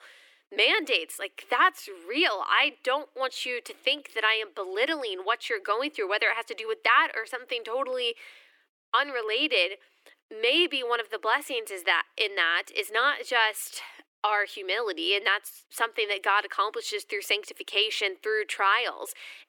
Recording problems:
thin; very; fading below 300 Hz

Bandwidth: 17.5 kHz